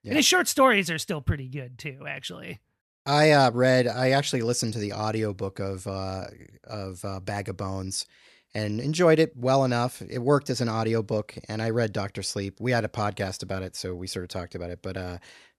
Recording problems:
none

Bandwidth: 13.5 kHz